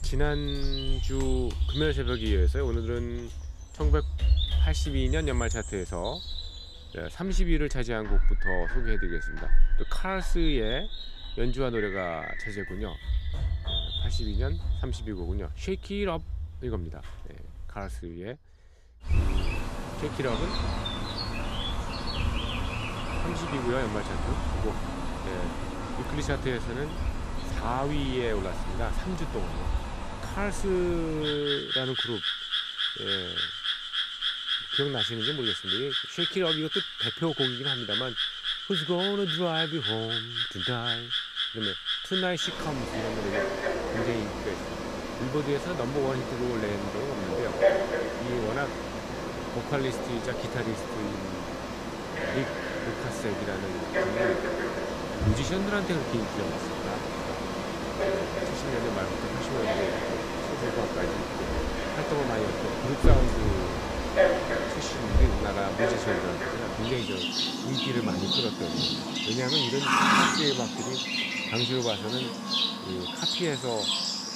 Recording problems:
animal sounds; very loud; throughout; 3 dB above the speech

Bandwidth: 14.5 kHz